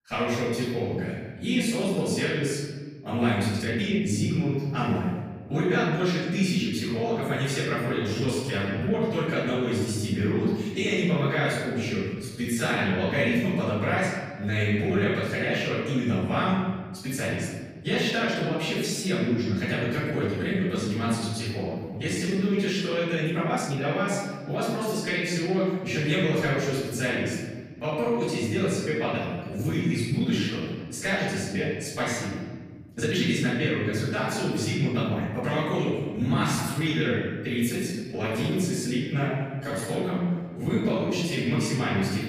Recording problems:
room echo; strong; dies away in 1.4 s
off-mic speech; far
uneven, jittery; strongly; from 2 to 42 s

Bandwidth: 14.5 kHz